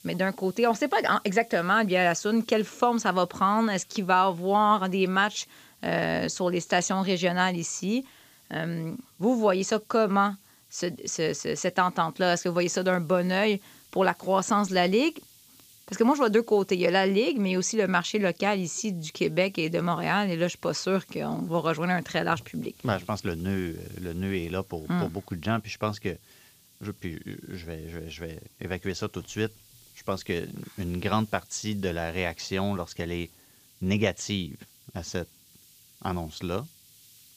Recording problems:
high frequencies cut off; noticeable; nothing above 8 kHz
hiss; faint; throughout; 25 dB below the speech

